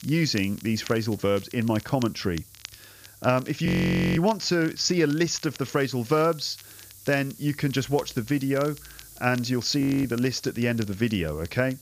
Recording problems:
high frequencies cut off; noticeable; nothing above 7 kHz
hiss; faint; throughout; 20 dB below the speech
crackle, like an old record; faint; 20 dB below the speech
audio freezing; at 3.5 s for 0.5 s and at 10 s

